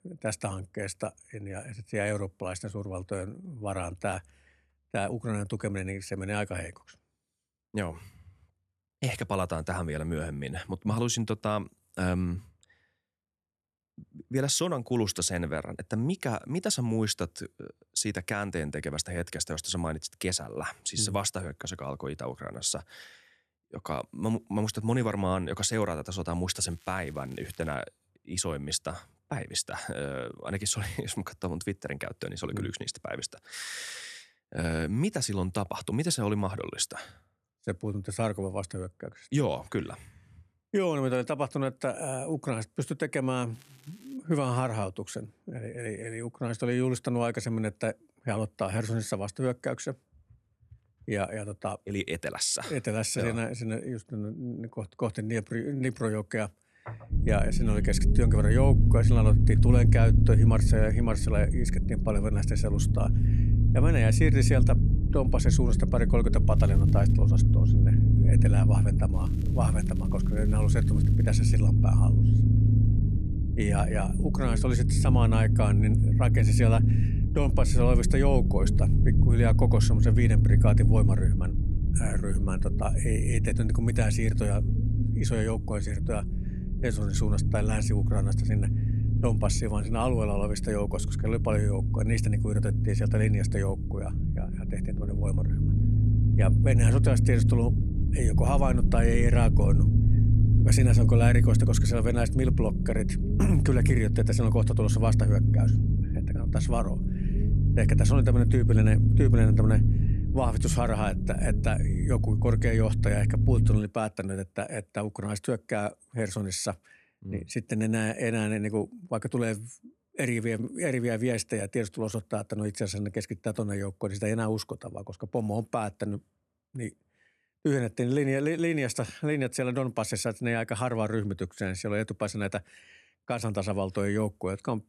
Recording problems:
low rumble; loud; from 57 s to 1:54; 4 dB below the speech
crackling; faint; 4 times, first at 27 s; 25 dB below the speech

